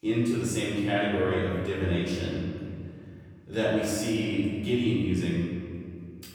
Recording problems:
room echo; strong; dies away in 2.2 s
off-mic speech; far

